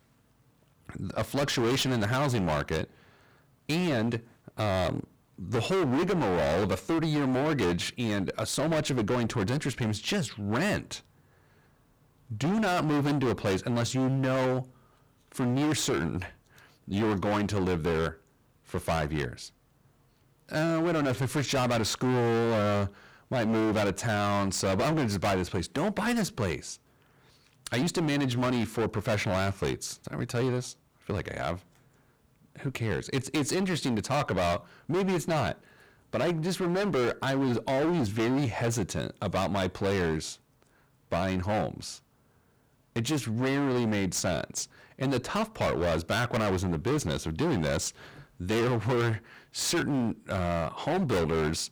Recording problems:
distortion; heavy; 23% of the sound clipped

